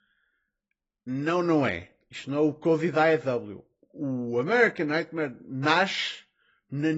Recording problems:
garbled, watery; badly; nothing above 7.5 kHz
abrupt cut into speech; at the end

